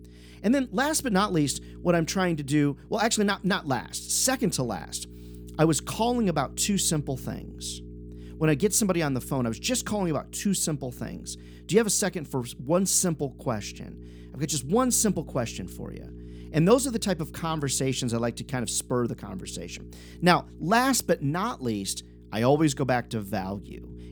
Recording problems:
electrical hum; faint; throughout; 60 Hz, 25 dB below the speech

